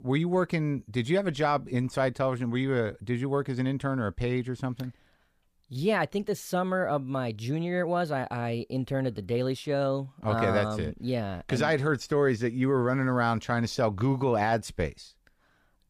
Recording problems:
none

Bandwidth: 15 kHz